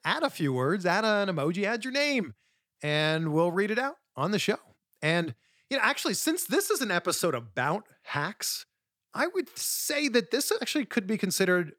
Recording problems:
none

